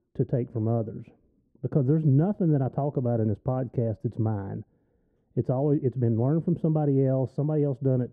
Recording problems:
muffled; very; fading above 1 kHz

